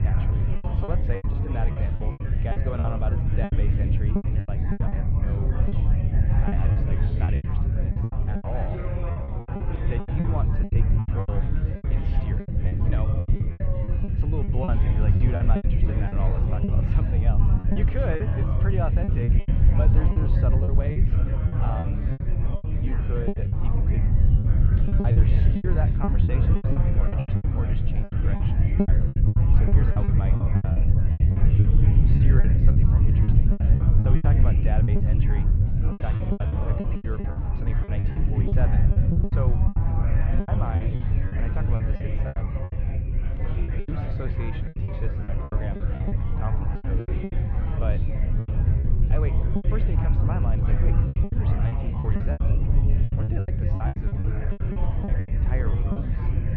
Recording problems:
muffled; very; fading above 3 kHz
low rumble; very loud; throughout; 1 dB above the speech
chatter from many people; loud; throughout; 4 dB below the speech
choppy; very; 15% of the speech affected

